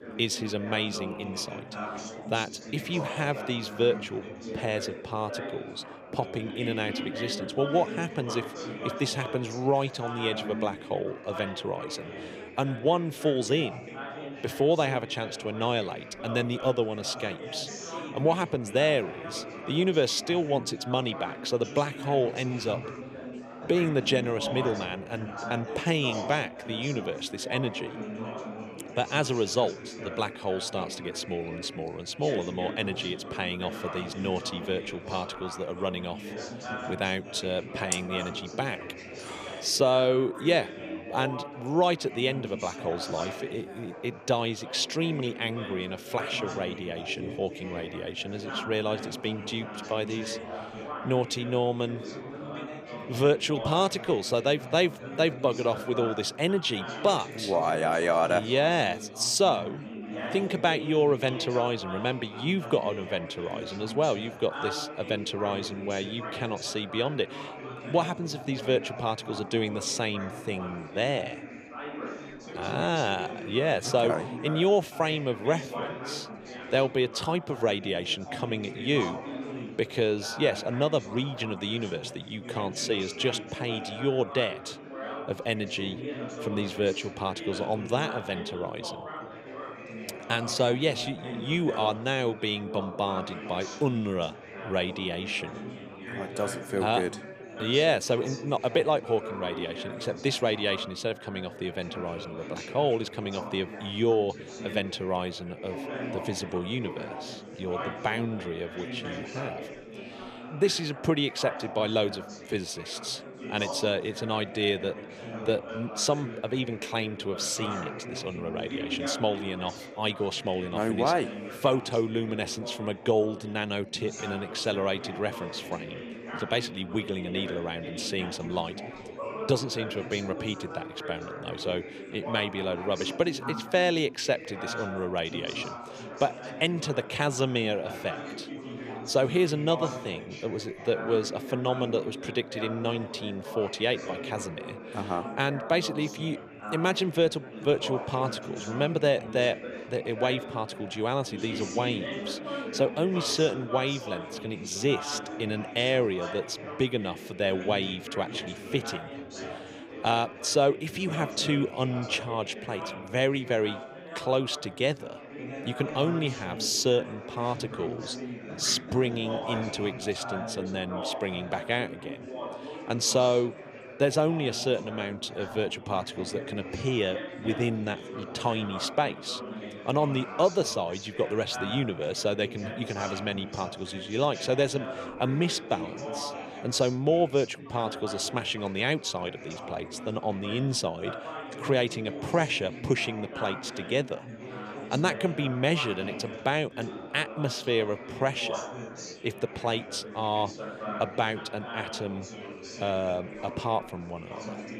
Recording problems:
chatter from many people; loud; throughout; 9 dB below the speech

